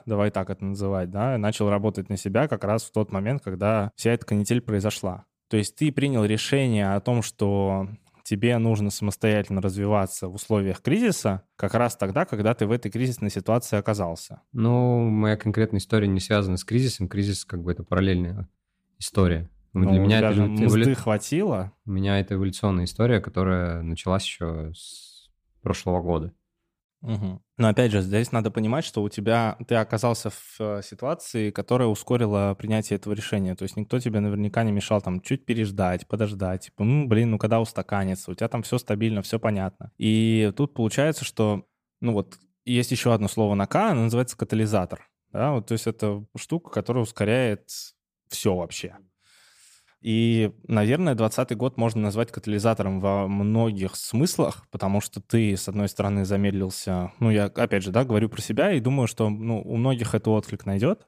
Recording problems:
none

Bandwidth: 15 kHz